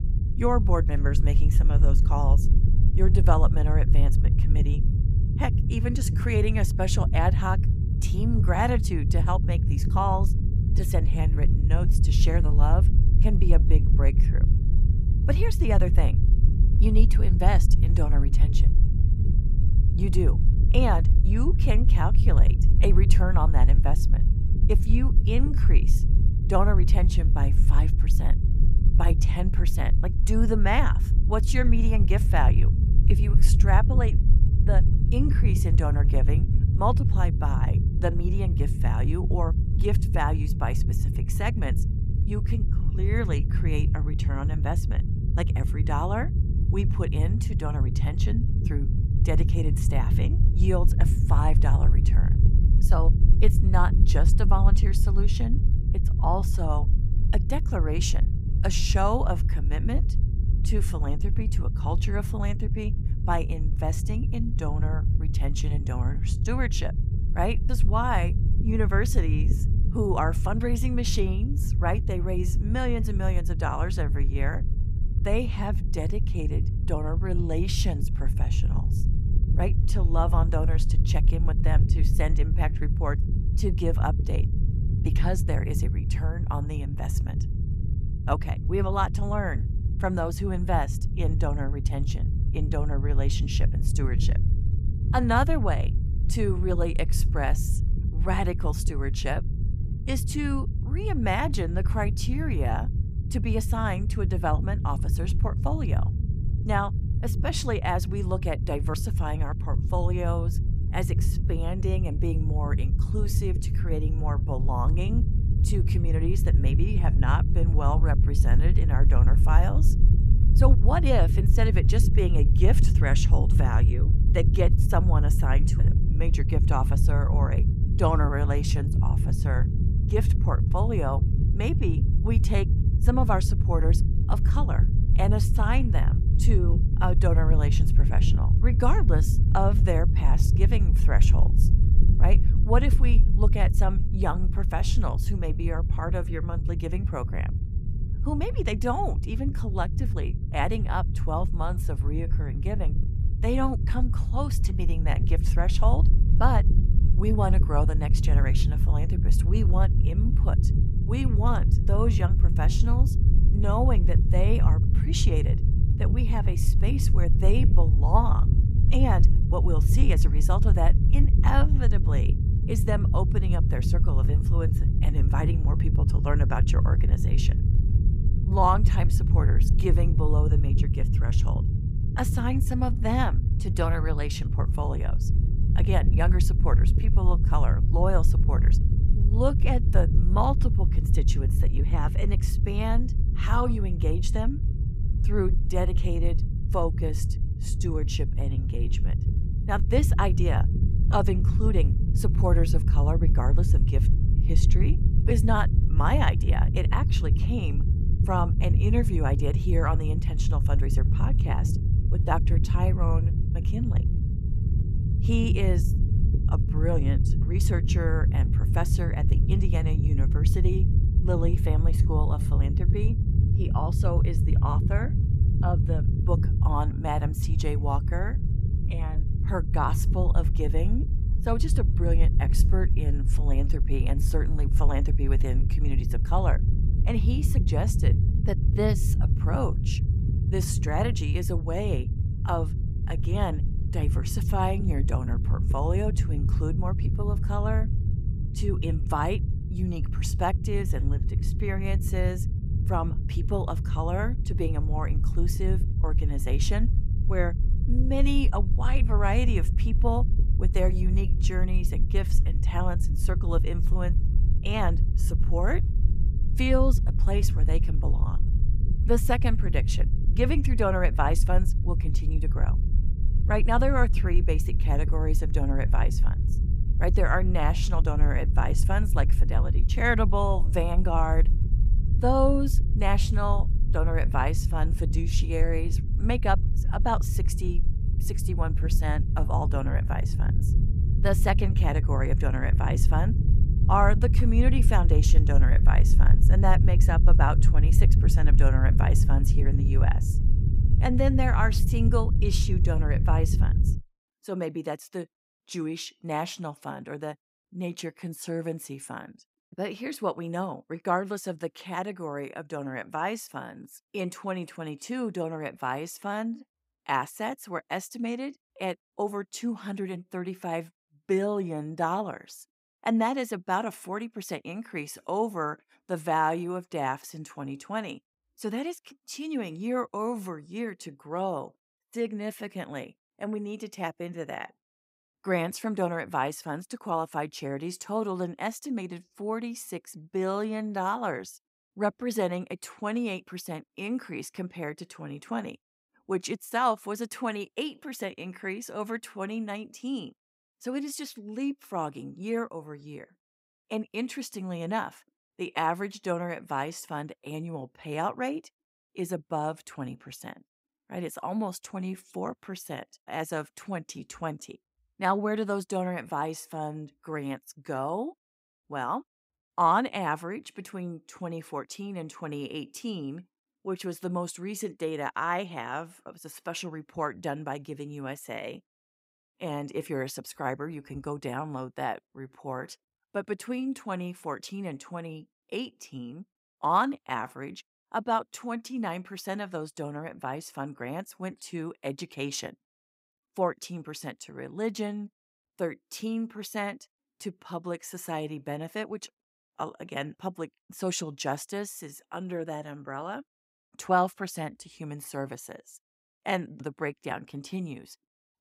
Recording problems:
low rumble; loud; until 5:04; 8 dB below the speech

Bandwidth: 15.5 kHz